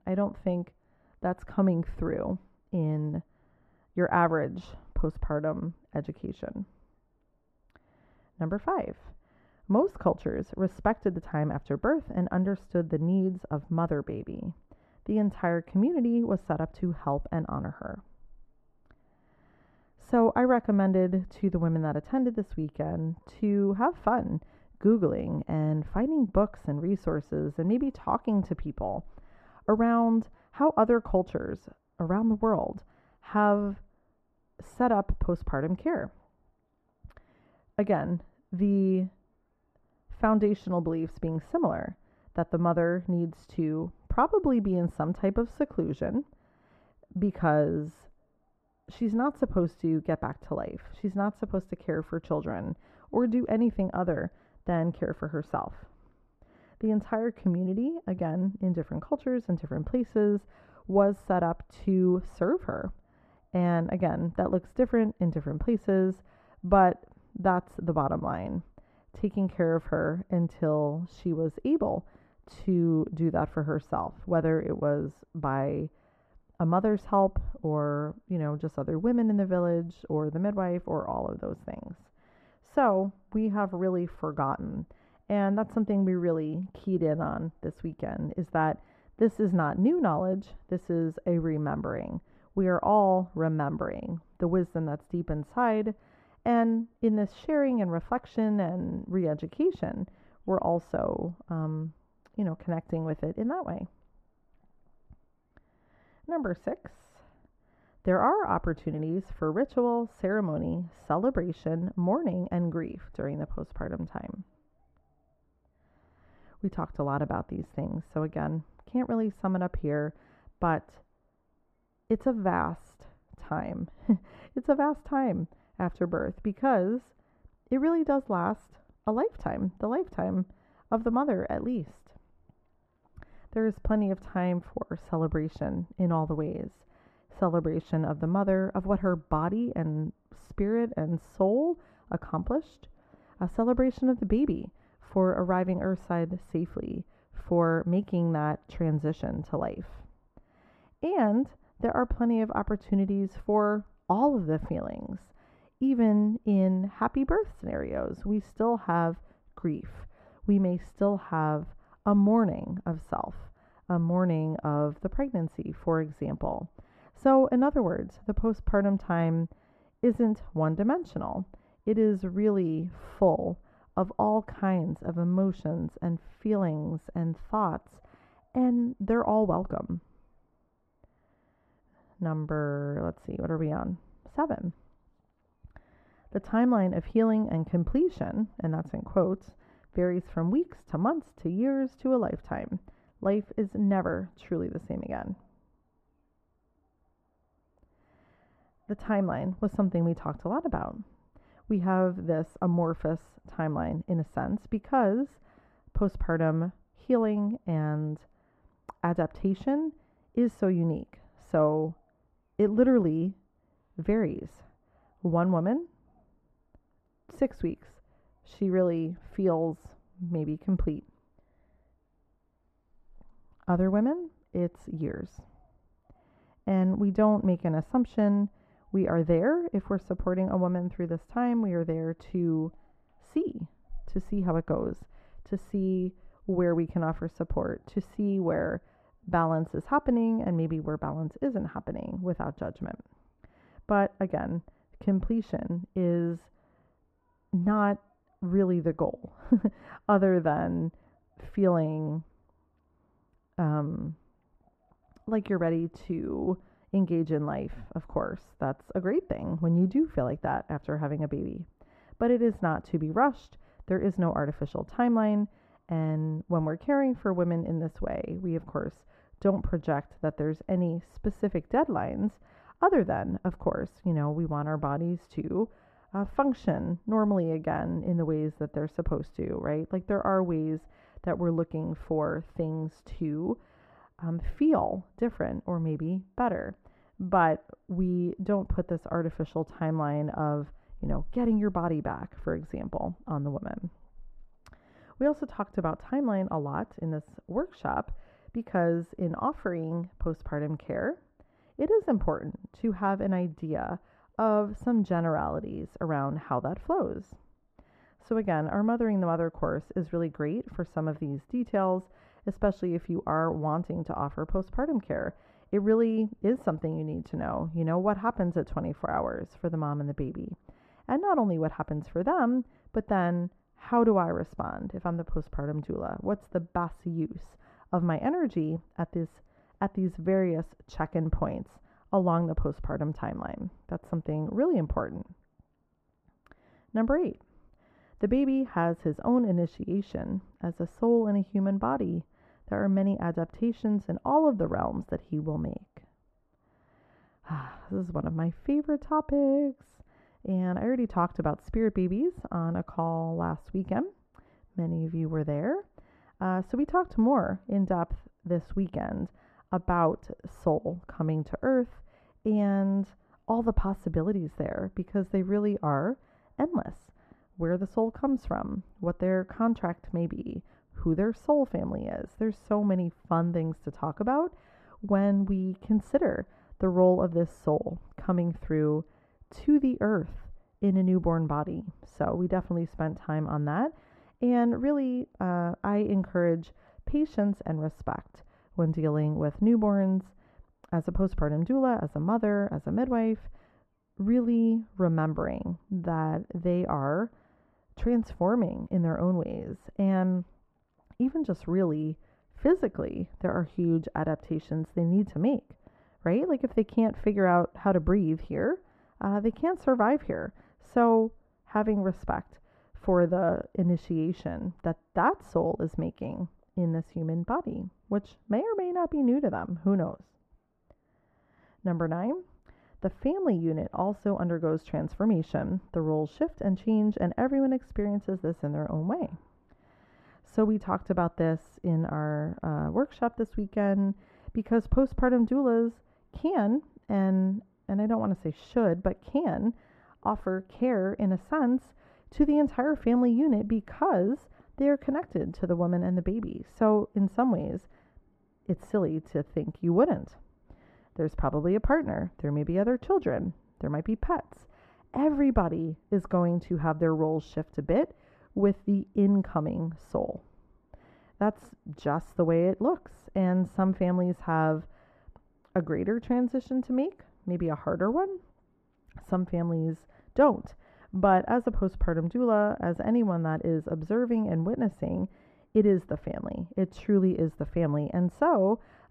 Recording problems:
muffled; very; fading above 2.5 kHz

